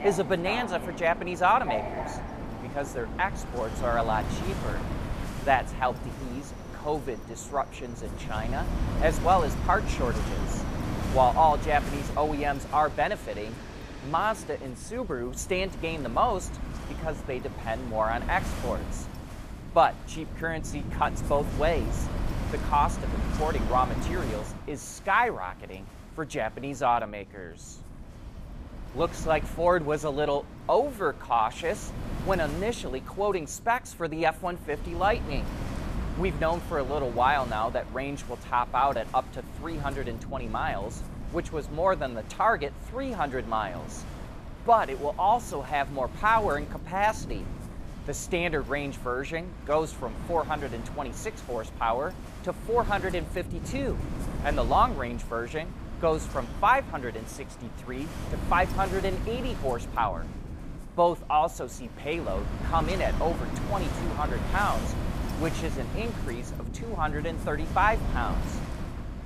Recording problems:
train or aircraft noise; noticeable; until 15 s; 10 dB below the speech
wind noise on the microphone; occasional gusts; 15 dB below the speech

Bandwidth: 14.5 kHz